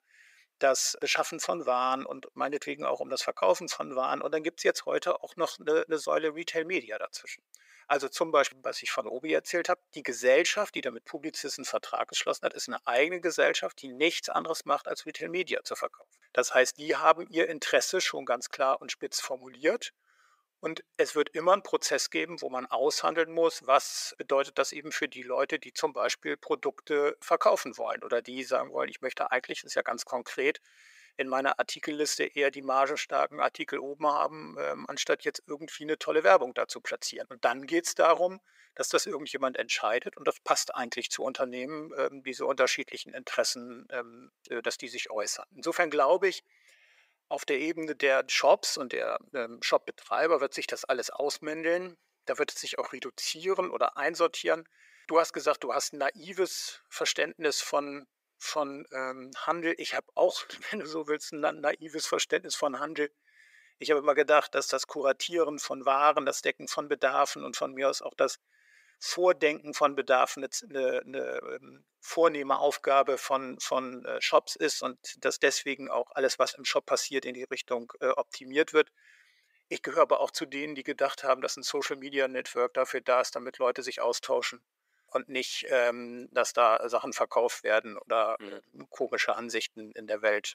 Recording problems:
thin; very; fading below 450 Hz

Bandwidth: 15.5 kHz